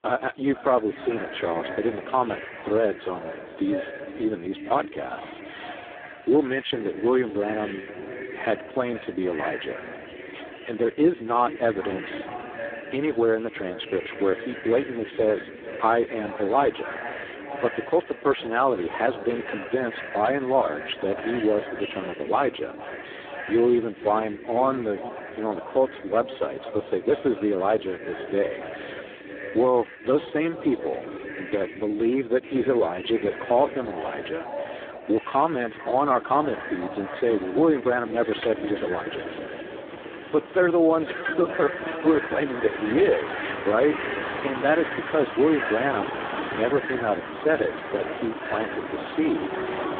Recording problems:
phone-call audio; poor line
echo of what is said; strong; throughout; 450 ms later, 10 dB below the speech
traffic noise; loud; from 37 s on; 10 dB below the speech

